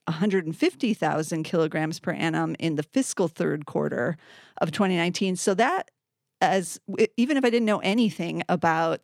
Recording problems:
none

